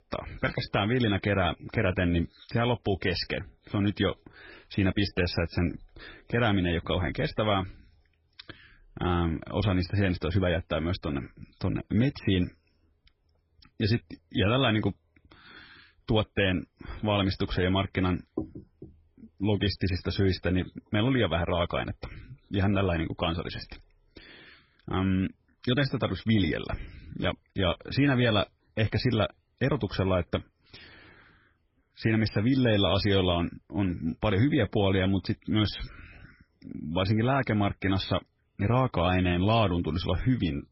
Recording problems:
garbled, watery; badly; nothing above 5.5 kHz

